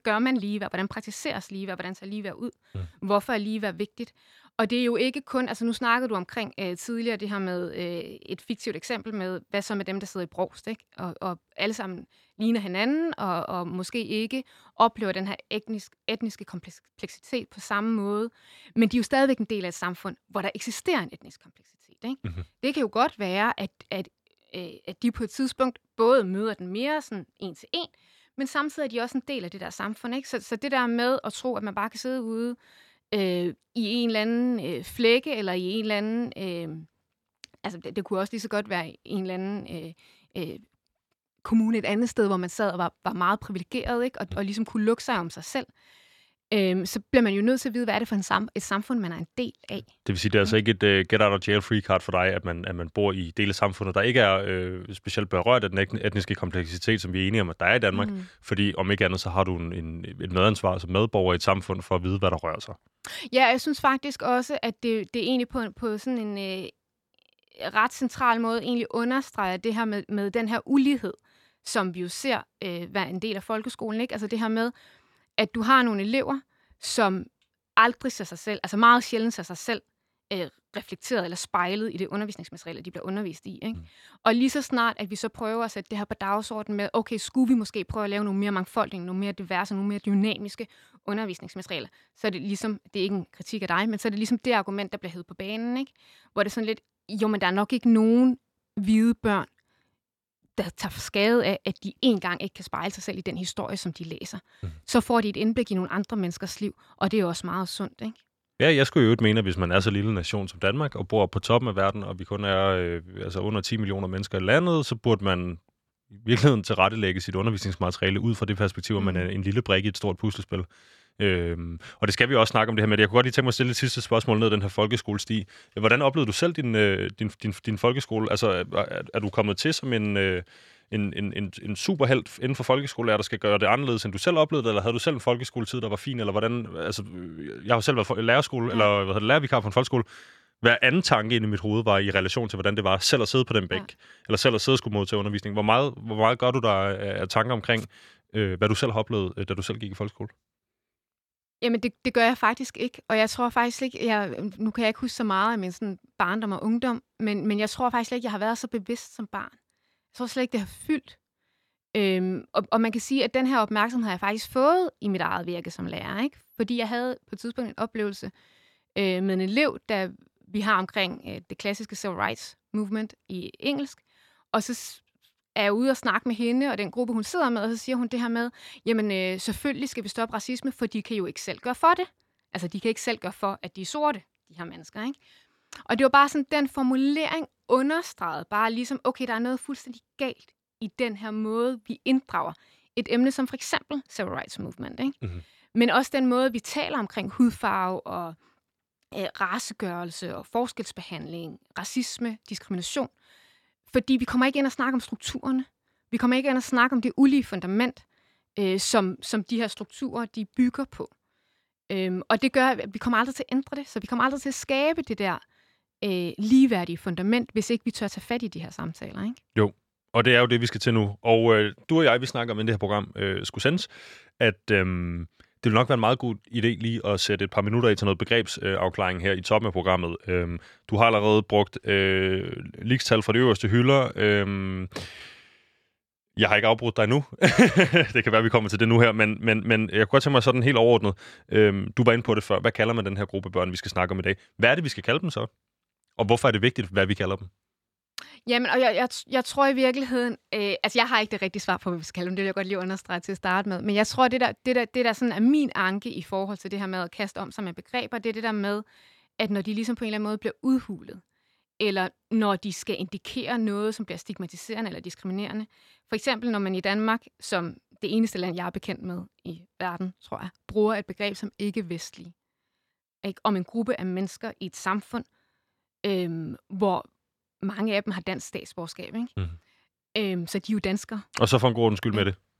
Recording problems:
none

